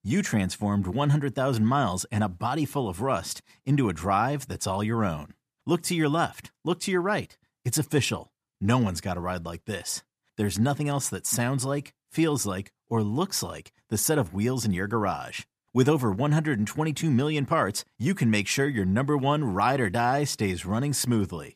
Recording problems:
none

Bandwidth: 14.5 kHz